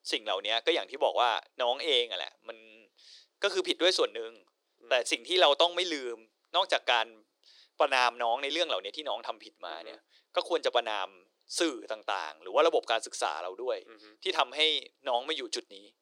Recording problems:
thin; very; fading below 350 Hz

